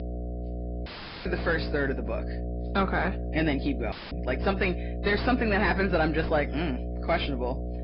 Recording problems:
distortion; heavy; 6 dB below the speech
high frequencies cut off; noticeable; nothing above 5 kHz
garbled, watery; slightly
electrical hum; noticeable; throughout; 60 Hz, 15 dB below the speech
audio cutting out; filled with static; at 1 s and at 4 s

